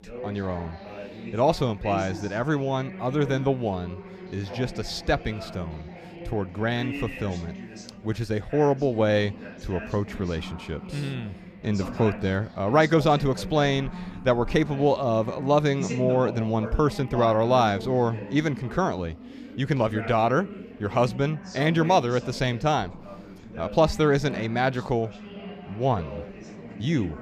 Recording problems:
background chatter; noticeable; throughout; 4 voices, 15 dB below the speech

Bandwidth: 15 kHz